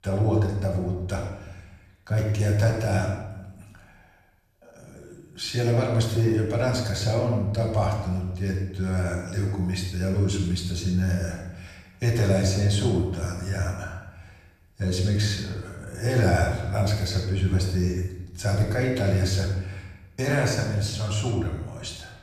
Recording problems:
off-mic speech; far
room echo; noticeable; dies away in 0.9 s

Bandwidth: 14 kHz